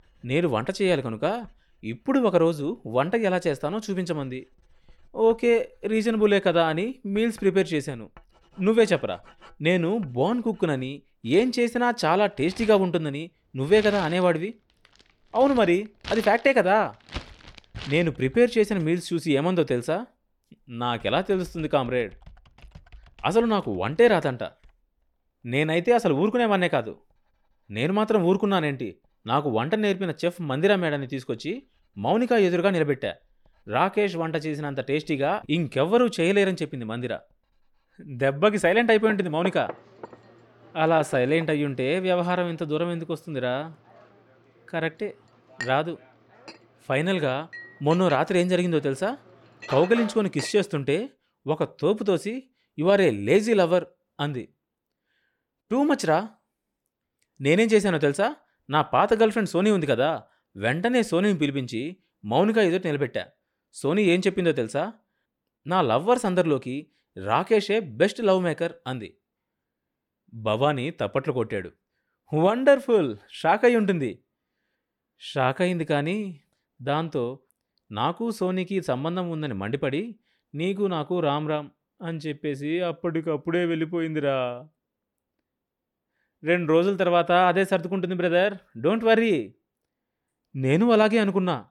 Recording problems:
household noises; noticeable; until 50 s; 20 dB below the speech

